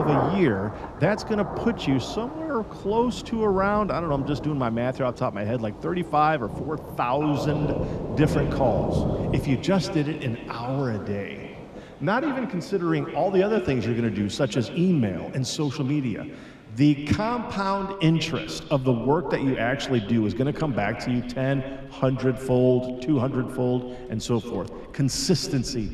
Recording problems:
echo of what is said; strong; from 7 s on; 130 ms later, 10 dB below the speech
rain or running water; loud; throughout; 8 dB below the speech
abrupt cut into speech; at the start

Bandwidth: 13.5 kHz